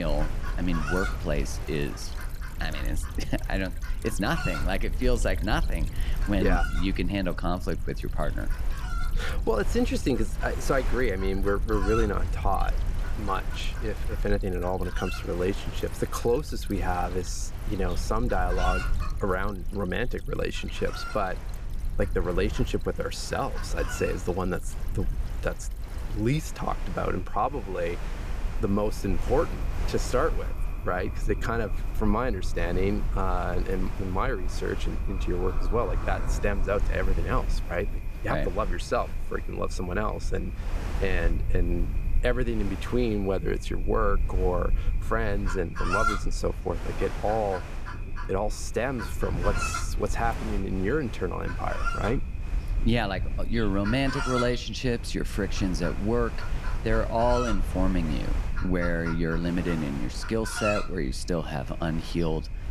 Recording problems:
animal sounds; loud; throughout; 9 dB below the speech
rain or running water; noticeable; throughout; 20 dB below the speech
wind noise on the microphone; occasional gusts; 15 dB below the speech
low rumble; faint; throughout; 20 dB below the speech
abrupt cut into speech; at the start

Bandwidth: 14.5 kHz